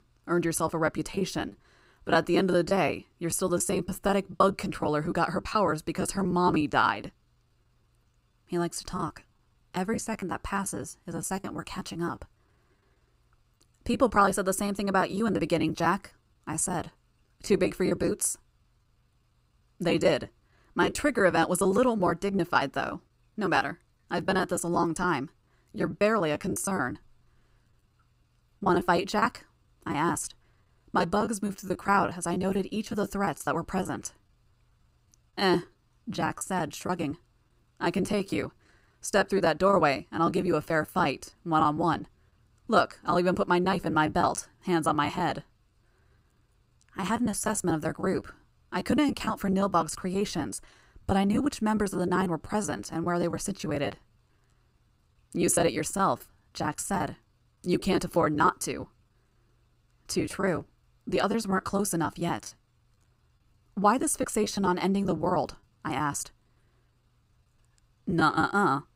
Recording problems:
choppy; very; 16% of the speech affected

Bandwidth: 15.5 kHz